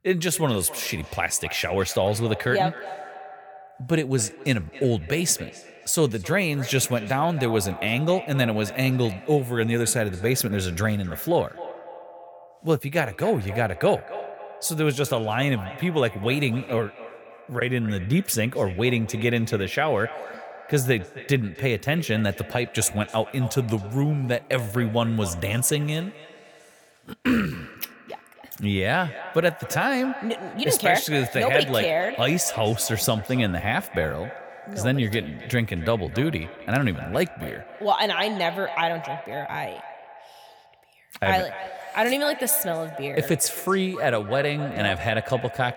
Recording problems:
echo of what is said; noticeable; throughout; 270 ms later, 15 dB below the speech

